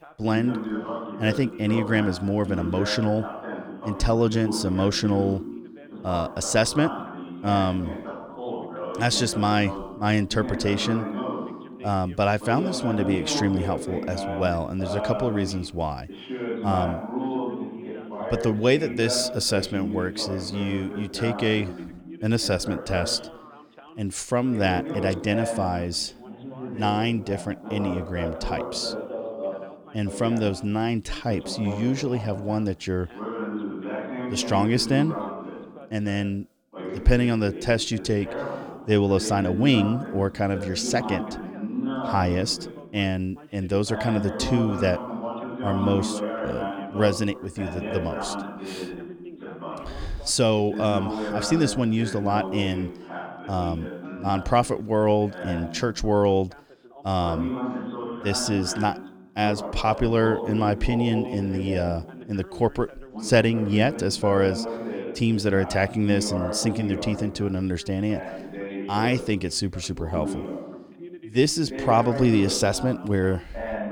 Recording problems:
background chatter; loud; throughout; 2 voices, 8 dB below the speech

